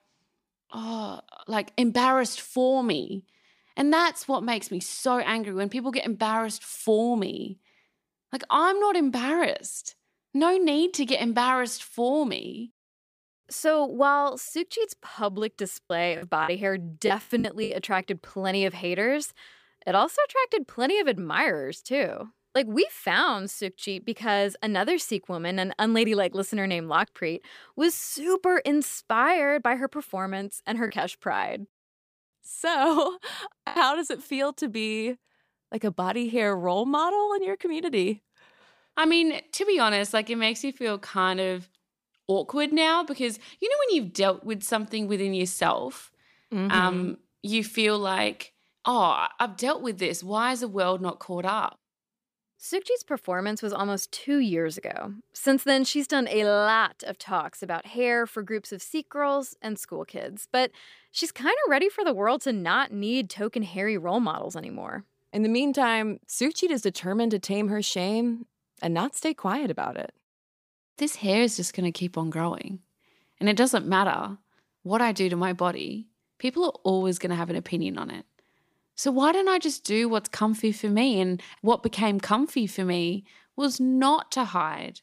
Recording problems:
choppy; very; from 16 to 18 s and at 34 s; 7% of the speech affected

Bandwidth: 15 kHz